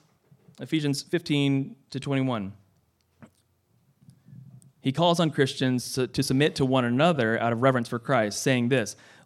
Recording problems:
uneven, jittery; strongly; from 0.5 to 8.5 s

